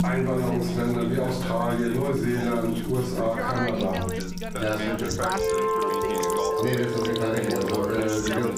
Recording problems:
off-mic speech; far
room echo; noticeable; dies away in 0.5 s
squashed, flat; somewhat
background music; loud; throughout; 3 dB below the speech
background chatter; loud; throughout; 2 voices, 6 dB below the speech
household noises; noticeable; throughout; 10 dB below the speech

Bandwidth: 15.5 kHz